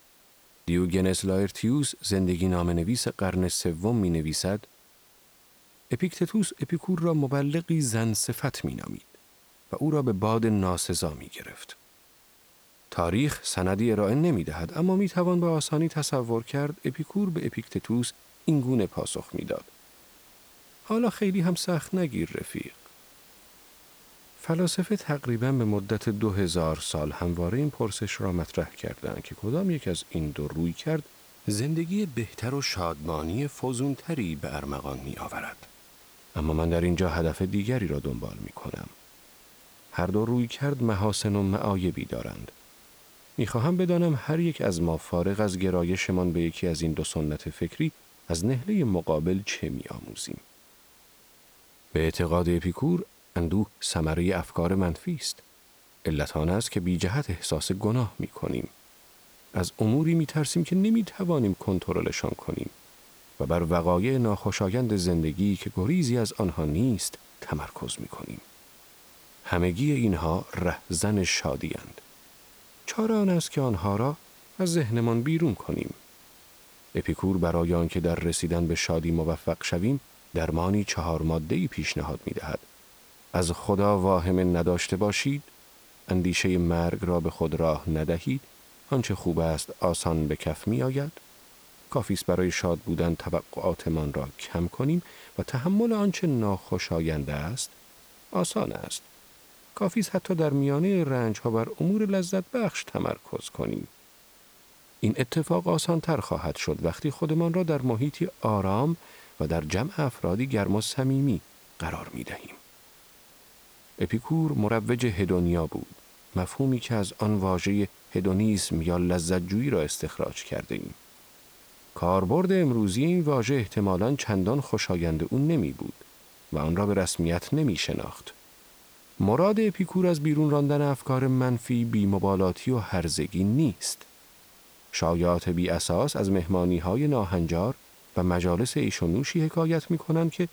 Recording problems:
hiss; faint; throughout; 25 dB below the speech

